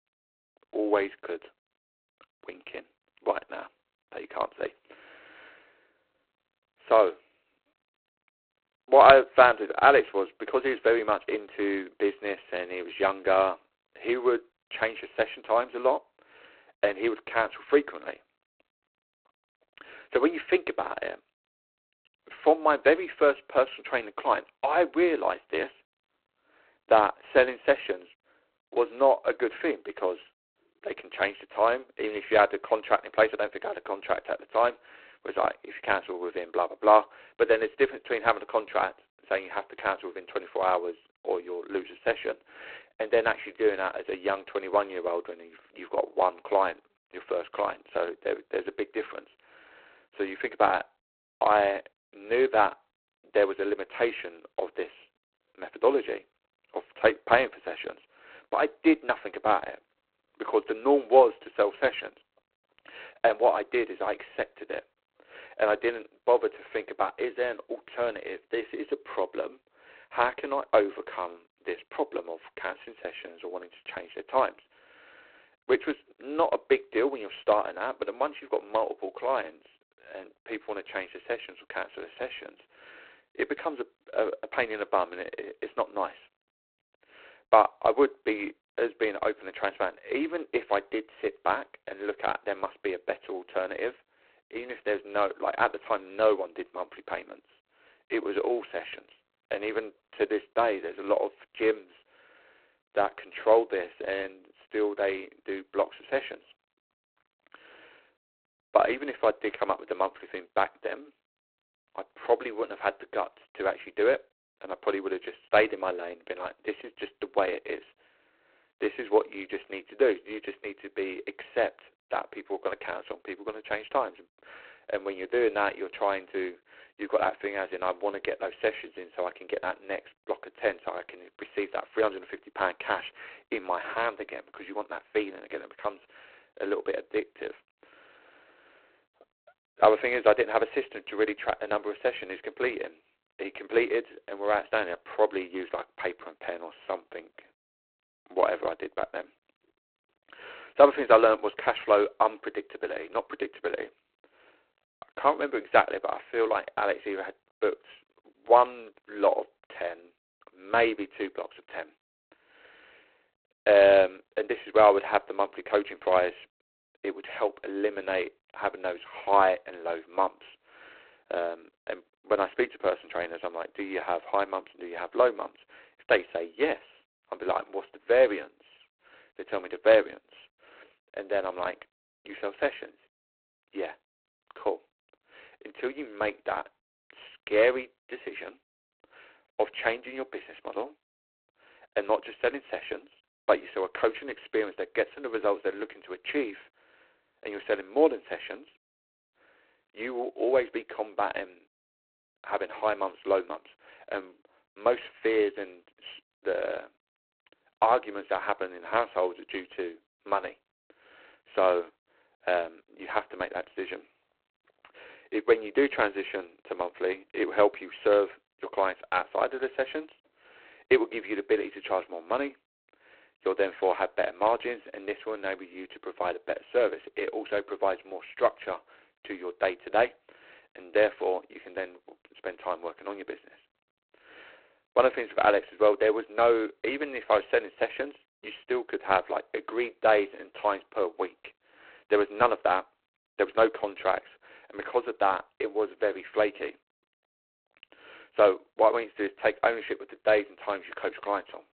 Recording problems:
phone-call audio; poor line; nothing above 4 kHz

